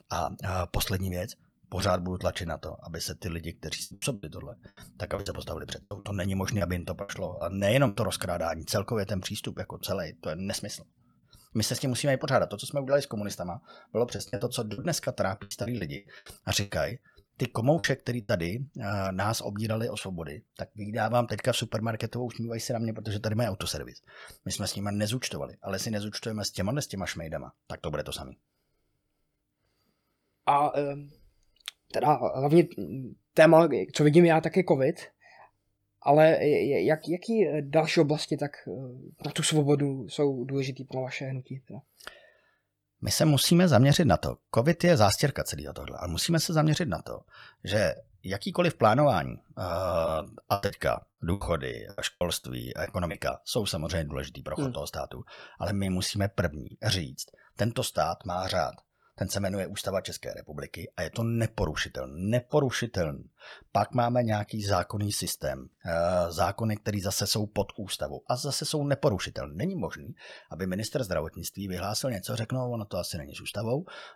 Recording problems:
choppy; very; from 4 to 8 s, from 14 to 18 s and from 50 to 53 s; 16% of the speech affected

